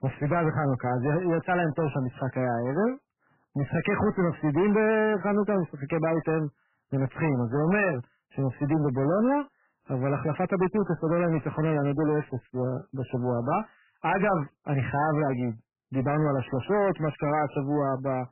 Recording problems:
garbled, watery; badly; nothing above 3 kHz
distortion; slight; 15% of the sound clipped

